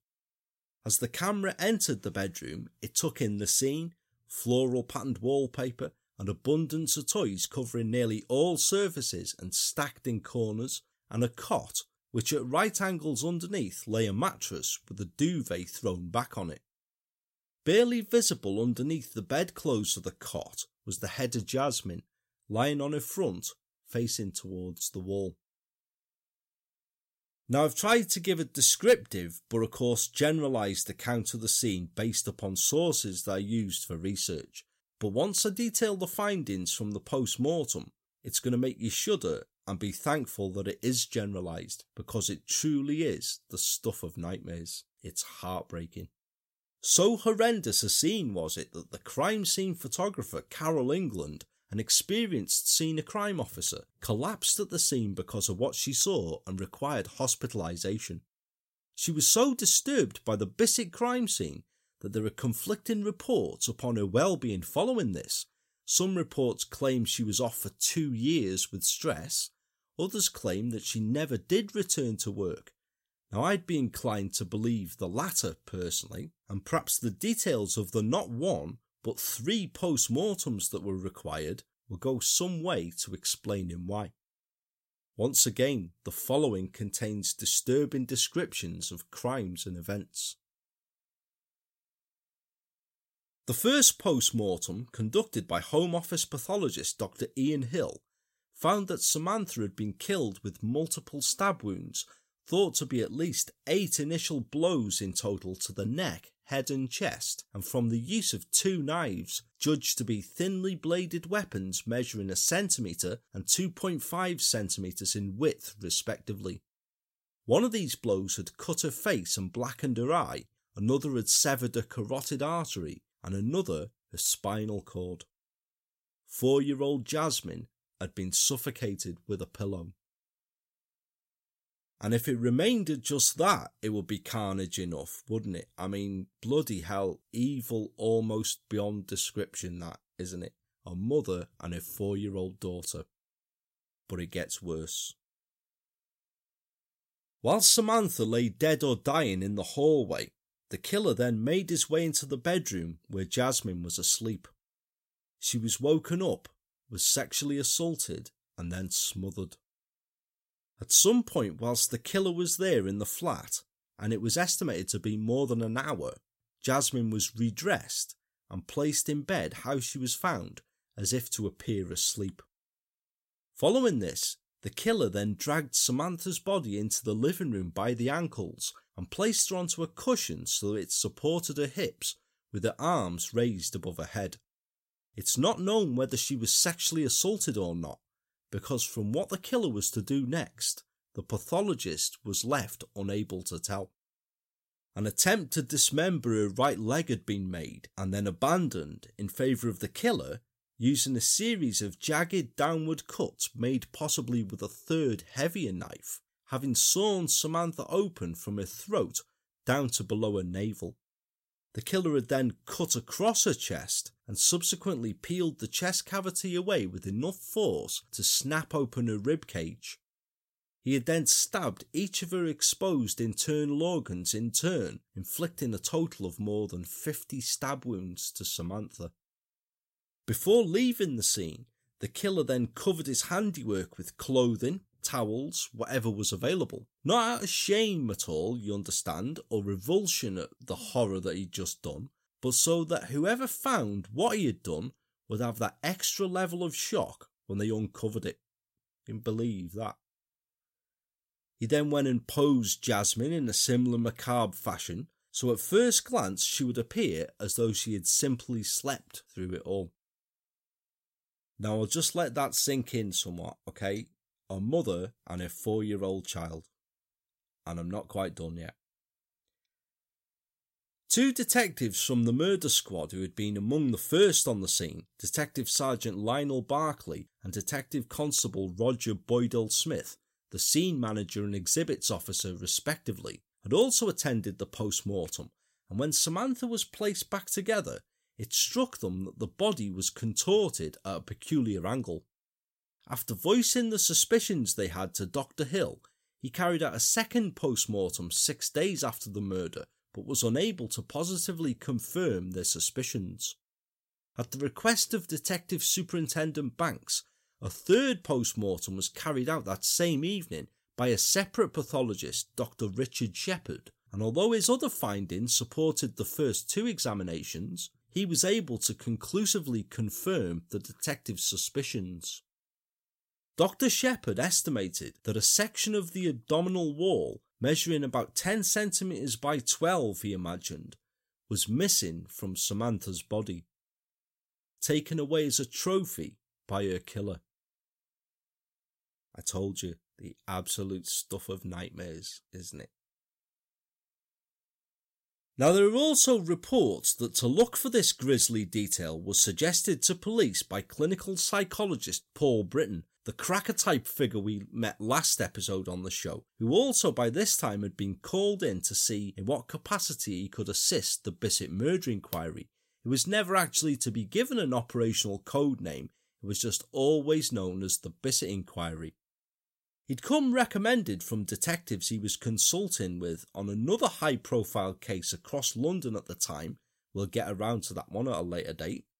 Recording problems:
uneven, jittery; slightly; from 7 s to 4:03

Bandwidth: 16 kHz